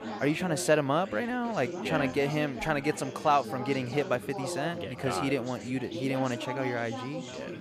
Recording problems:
background chatter; loud; throughout; 4 voices, 9 dB below the speech

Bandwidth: 14.5 kHz